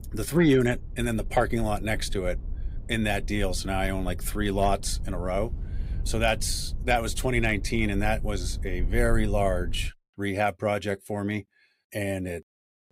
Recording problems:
low rumble; faint; until 10 s; 25 dB below the speech

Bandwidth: 15.5 kHz